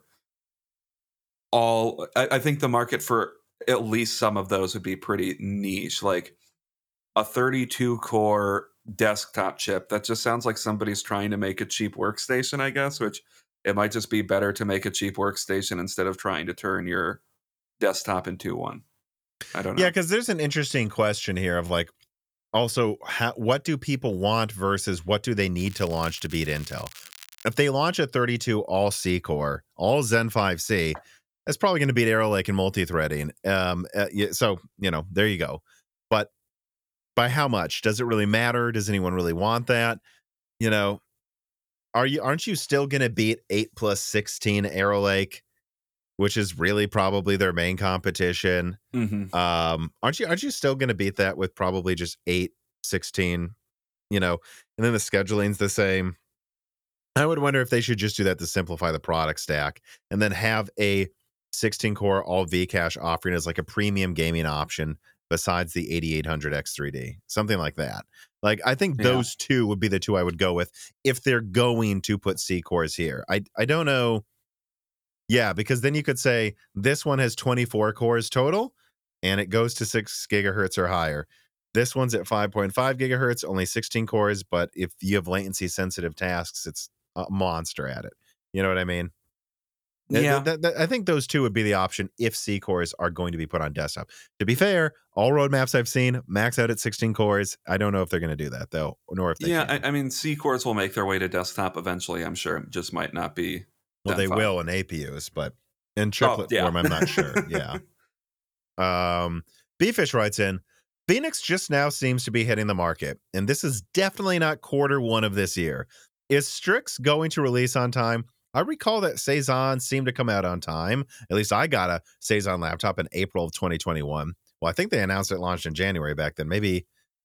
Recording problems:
crackling; noticeable; from 26 to 27 s; 20 dB below the speech

